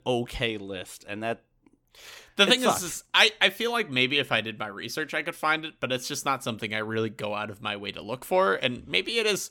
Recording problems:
none

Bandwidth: 17.5 kHz